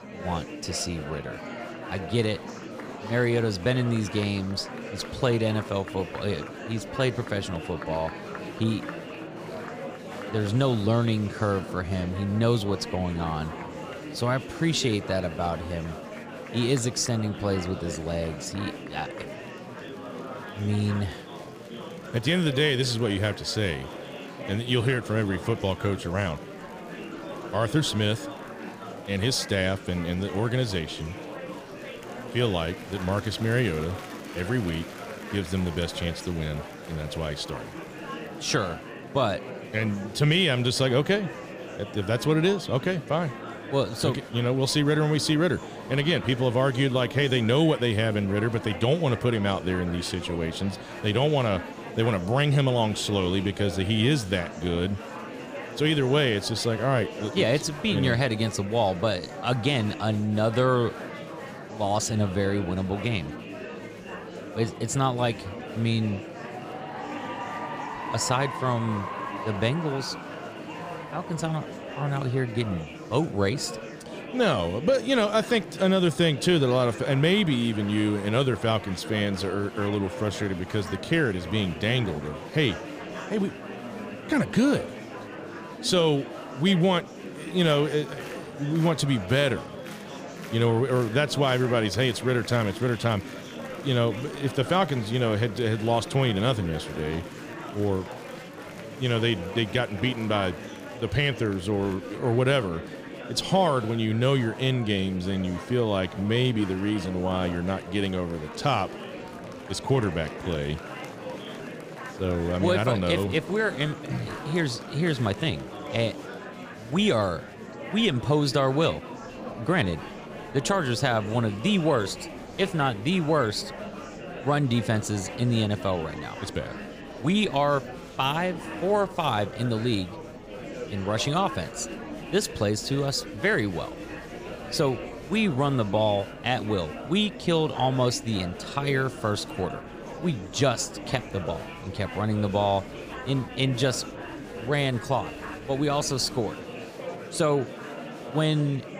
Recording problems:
murmuring crowd; noticeable; throughout; 10 dB below the speech

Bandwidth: 15 kHz